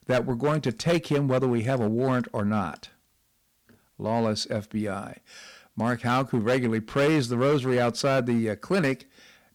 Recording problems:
distortion; slight; 9% of the sound clipped

